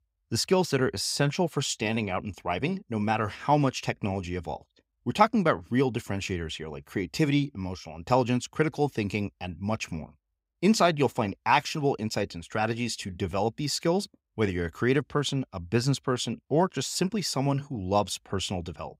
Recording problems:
none

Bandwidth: 15.5 kHz